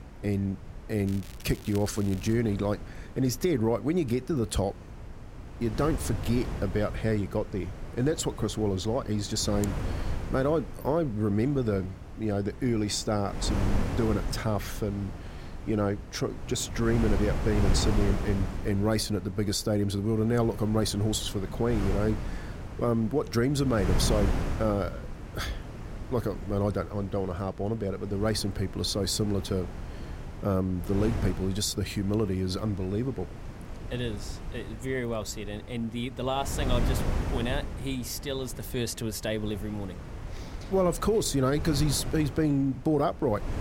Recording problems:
wind noise on the microphone; occasional gusts; 10 dB below the speech
crackling; noticeable; from 1 to 2.5 s; 20 dB below the speech

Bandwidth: 16 kHz